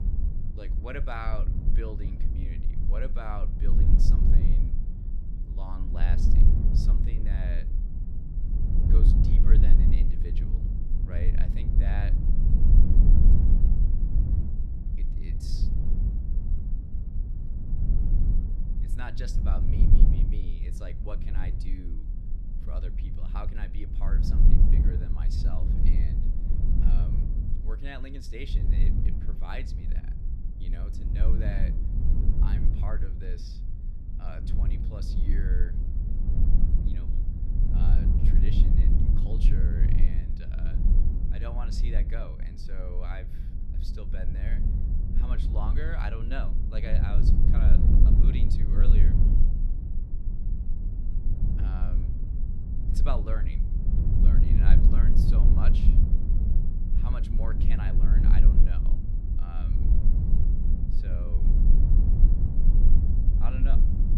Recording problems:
low rumble; loud; throughout; as loud as the speech

